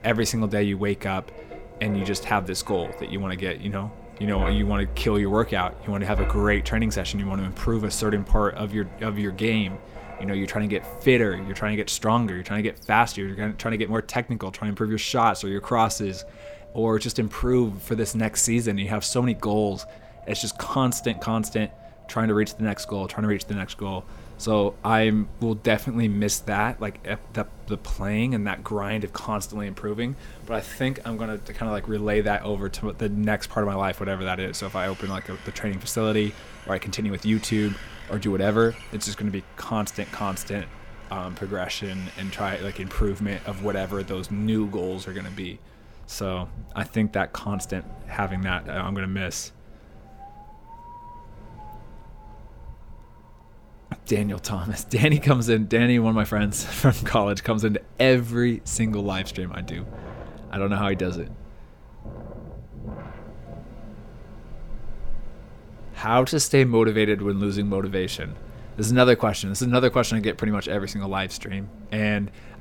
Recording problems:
wind in the background; noticeable; throughout; 15 dB below the speech

